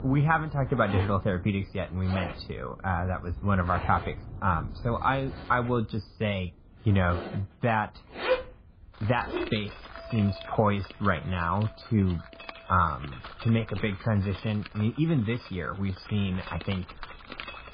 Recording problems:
garbled, watery; badly; nothing above 5 kHz
muffled; very slightly; fading above 4 kHz
household noises; loud; throughout; 10 dB below the speech
rain or running water; noticeable; throughout; 15 dB below the speech

